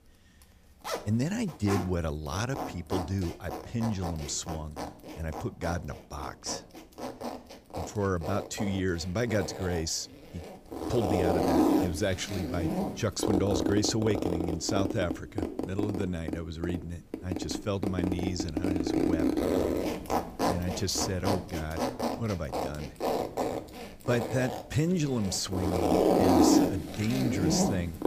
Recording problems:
household noises; very loud; throughout; 1 dB above the speech

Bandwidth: 15 kHz